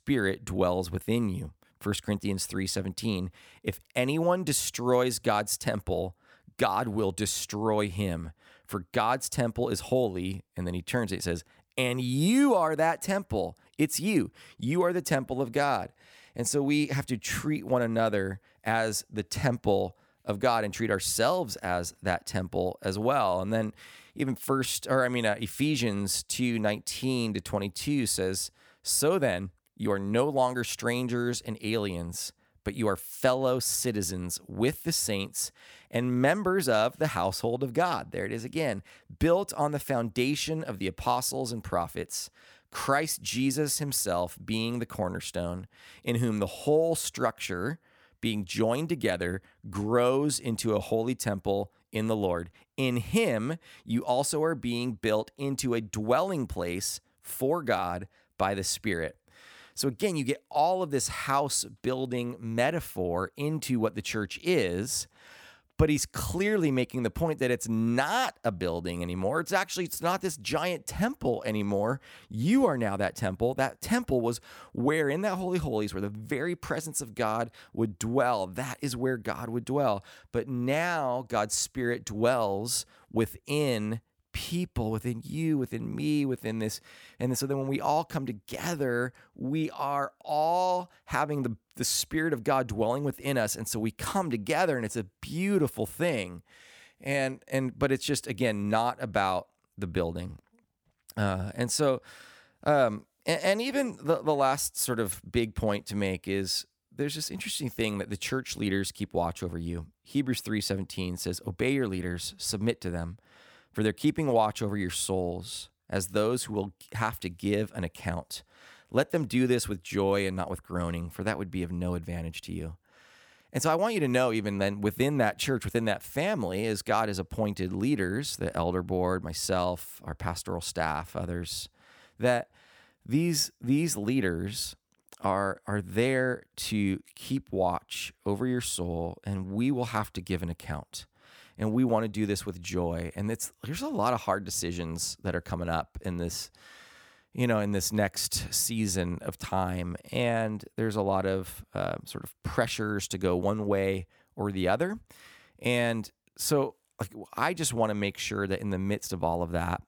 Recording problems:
none

